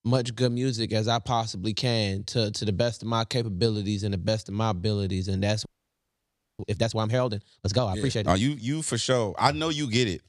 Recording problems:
audio freezing; at 5.5 s for 1 s

